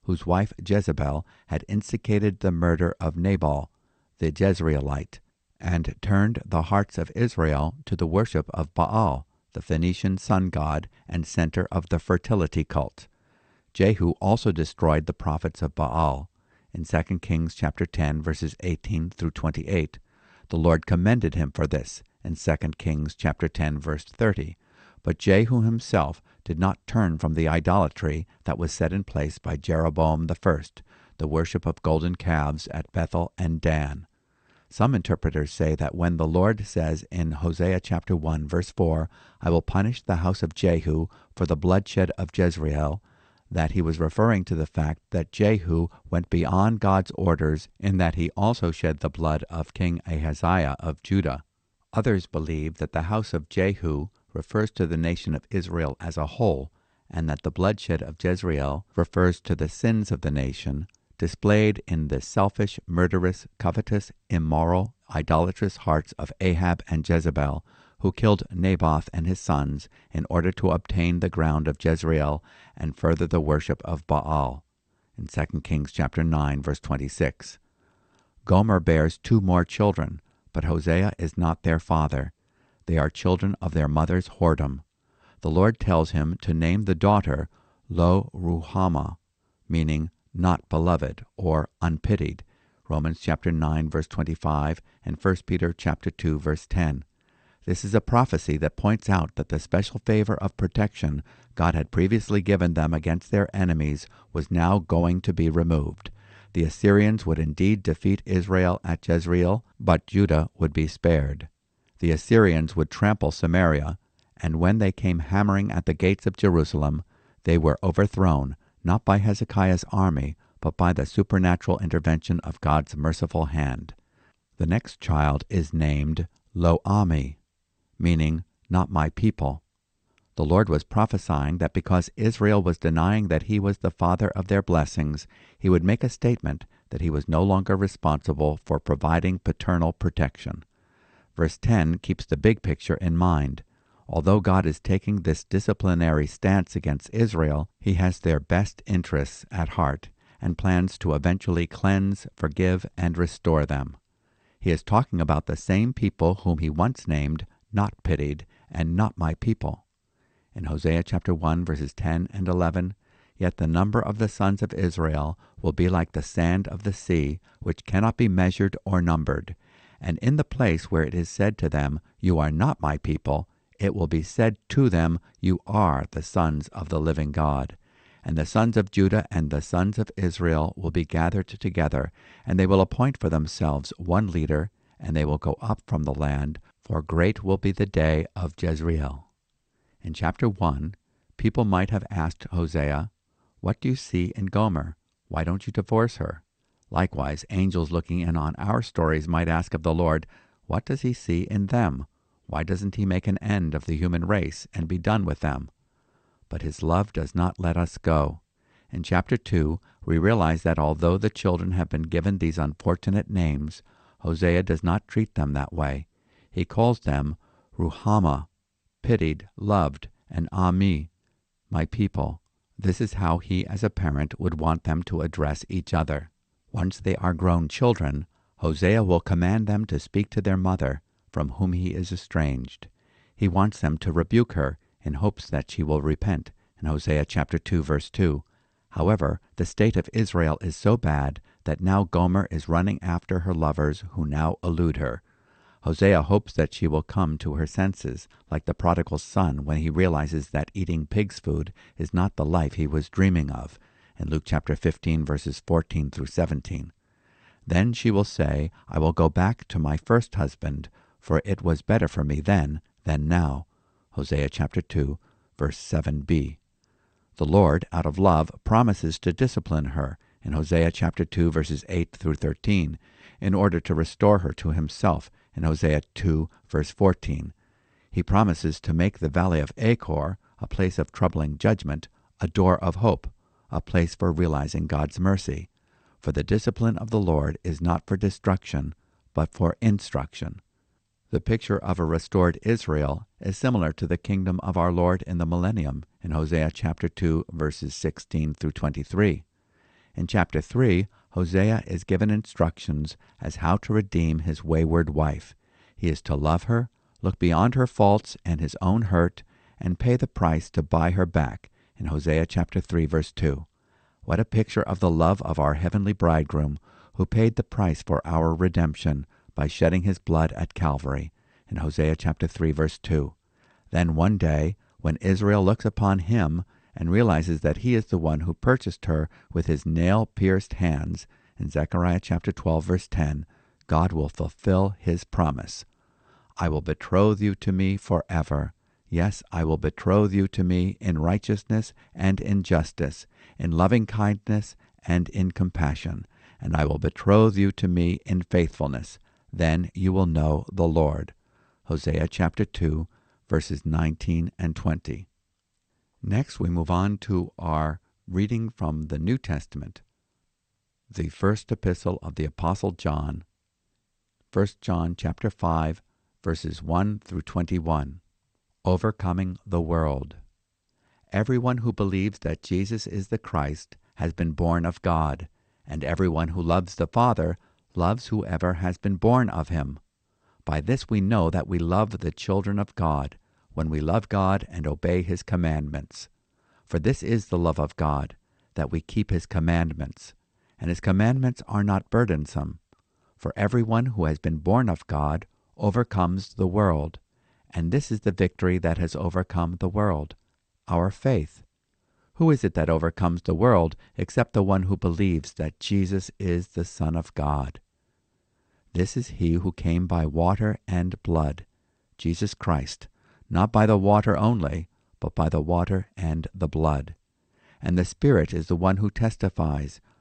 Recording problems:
garbled, watery; slightly; nothing above 8 kHz

